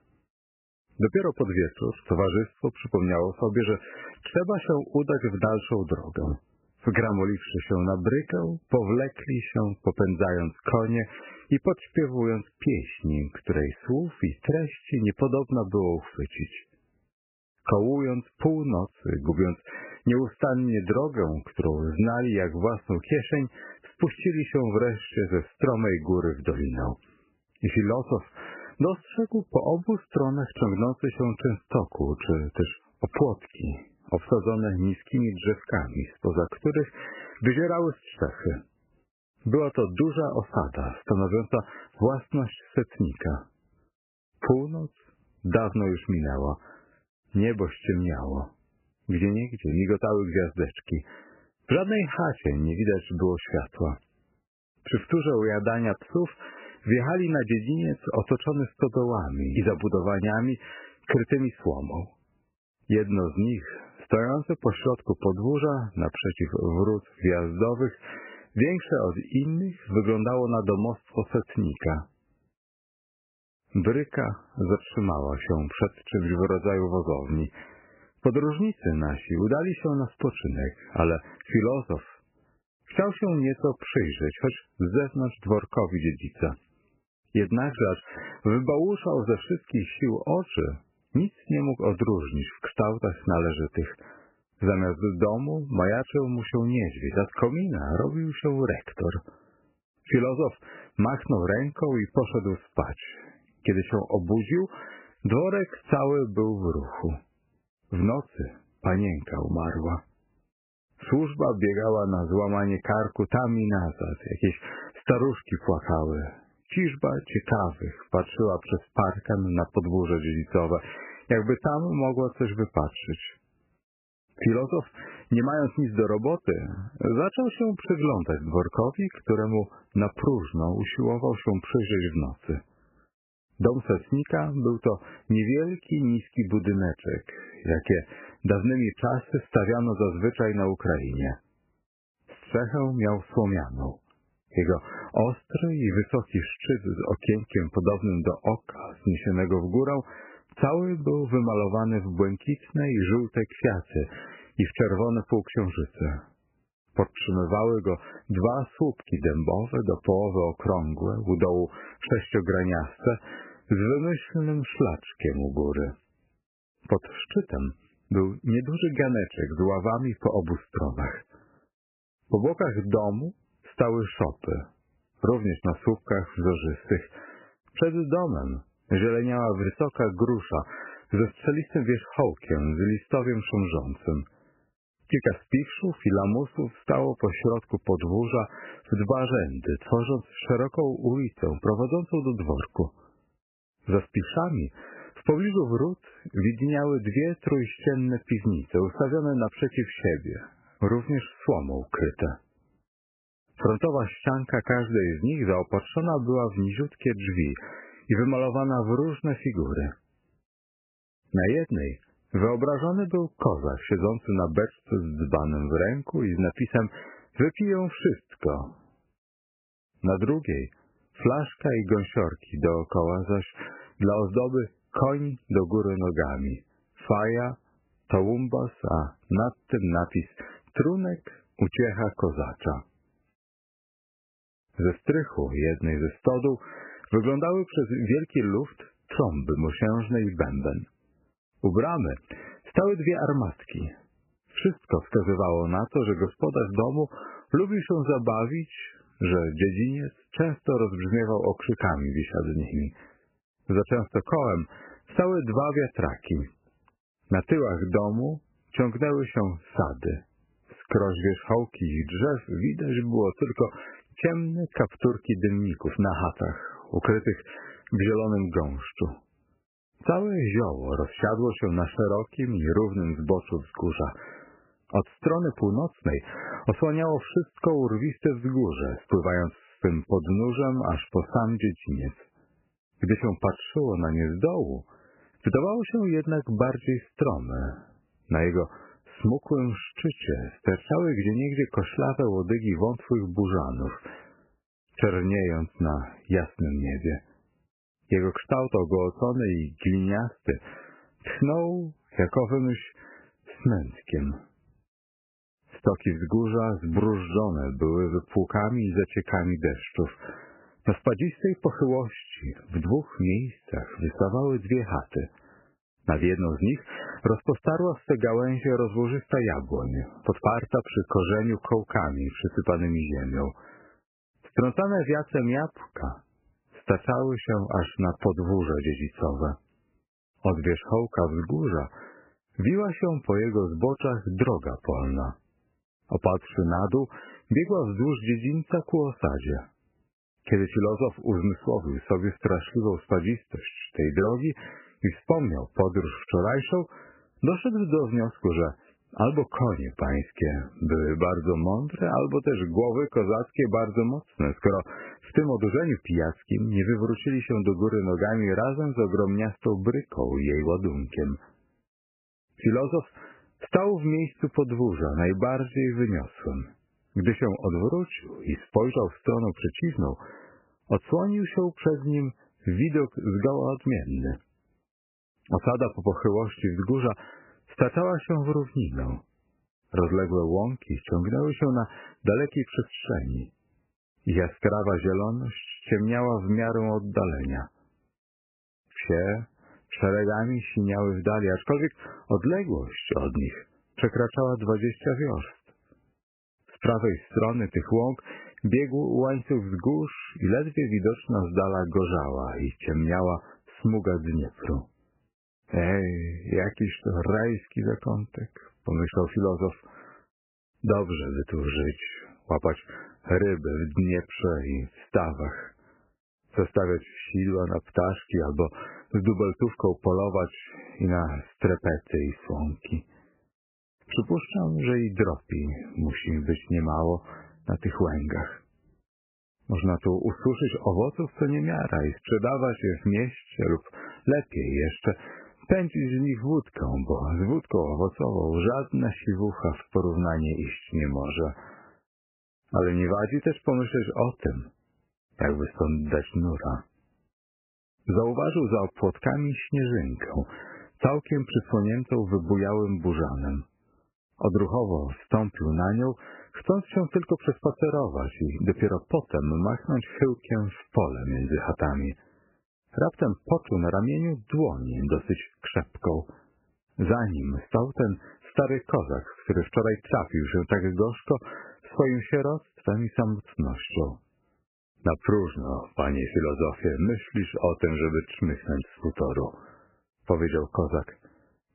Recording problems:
garbled, watery; badly; nothing above 3 kHz

